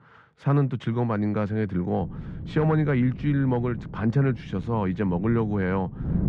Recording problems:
muffled; very; fading above 1.5 kHz
wind noise on the microphone; occasional gusts; from 2 s on; 15 dB below the speech

